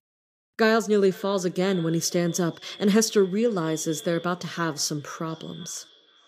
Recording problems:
echo of what is said; faint; throughout; 500 ms later, 20 dB below the speech

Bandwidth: 15 kHz